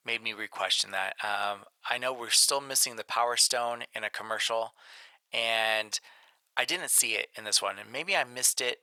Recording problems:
thin; very; fading below 800 Hz

